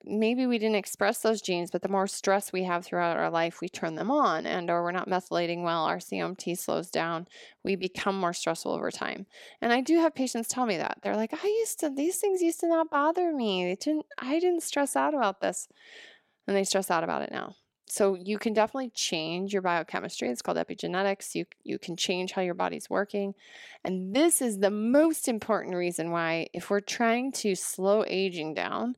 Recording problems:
none

